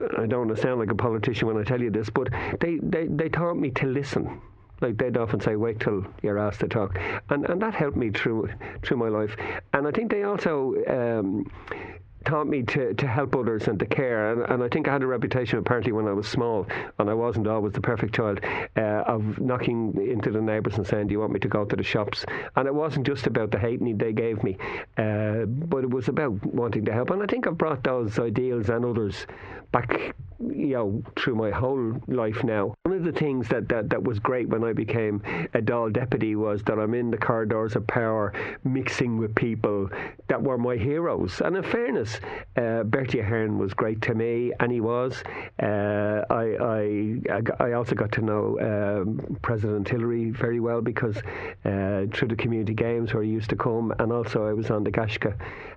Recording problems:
squashed, flat; heavily
muffled; very slightly; fading above 2 kHz

